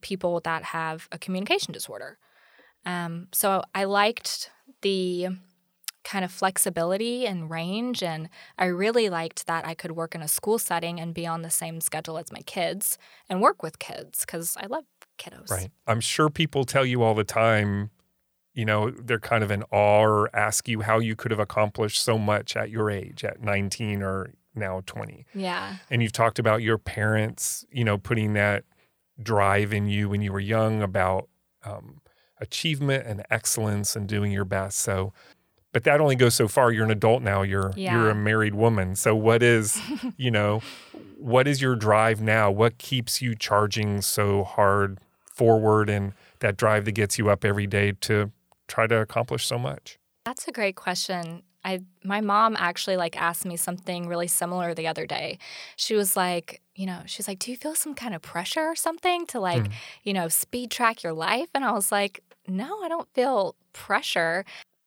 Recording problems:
none

